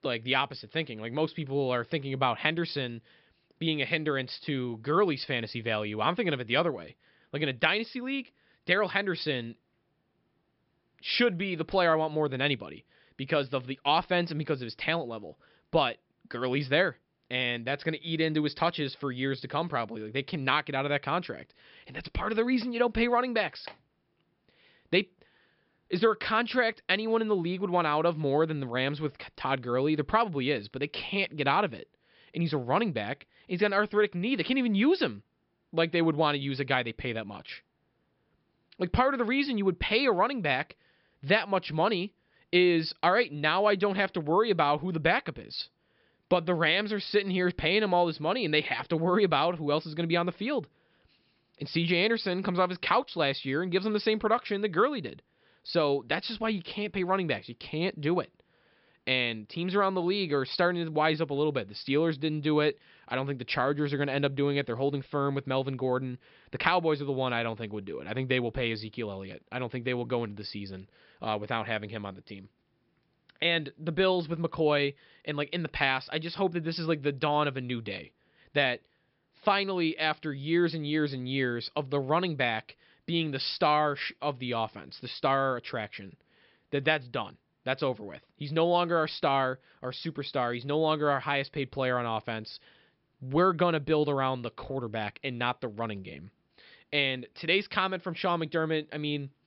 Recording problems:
high frequencies cut off; noticeable; nothing above 5.5 kHz

